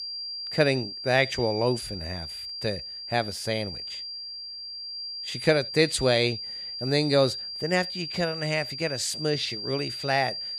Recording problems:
high-pitched whine; loud; throughout; 4.5 kHz, 7 dB below the speech

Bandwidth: 15 kHz